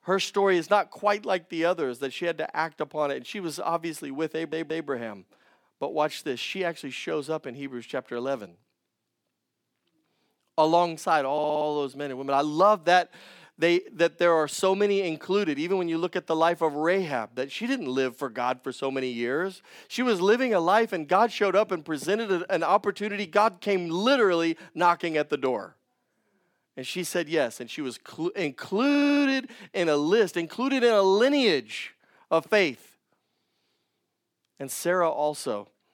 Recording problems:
audio stuttering; at 4.5 s, at 11 s and at 29 s

